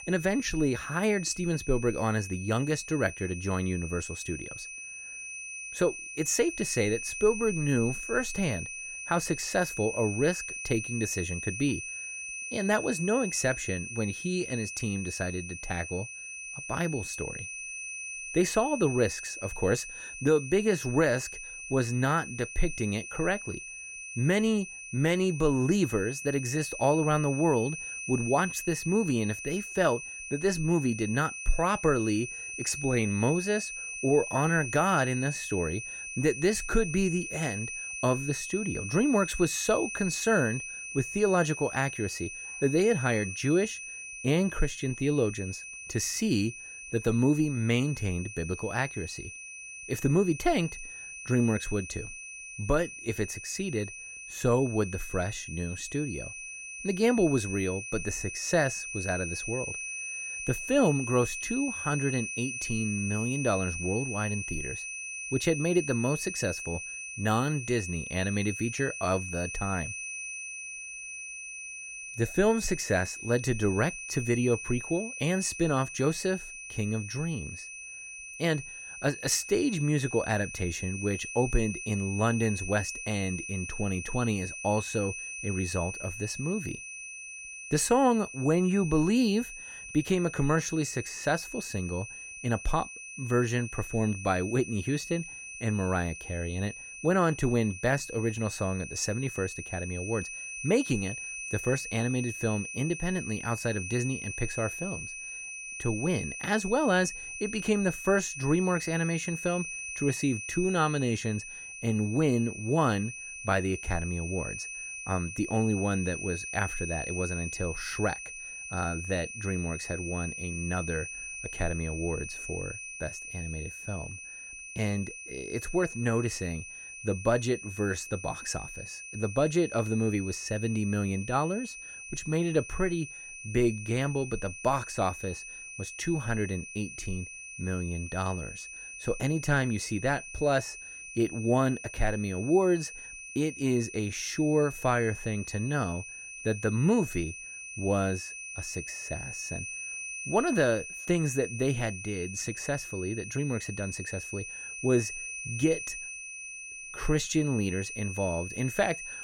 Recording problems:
high-pitched whine; loud; throughout; 2.5 kHz, 8 dB below the speech

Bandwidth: 16.5 kHz